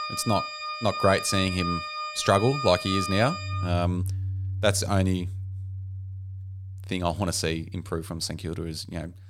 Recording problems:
background music; loud; throughout; 6 dB below the speech

